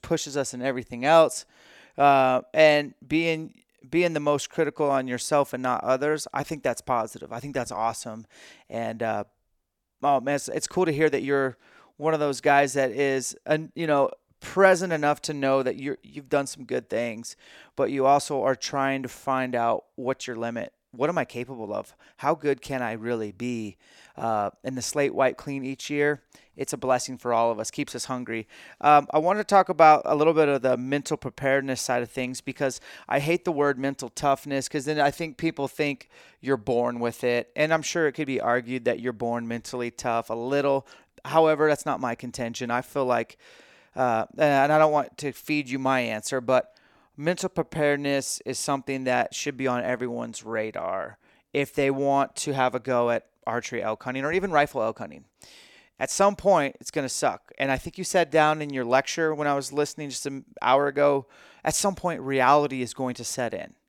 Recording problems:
none

